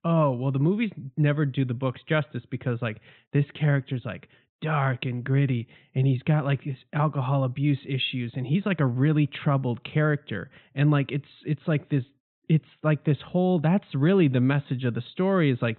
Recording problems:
high frequencies cut off; severe; nothing above 4 kHz

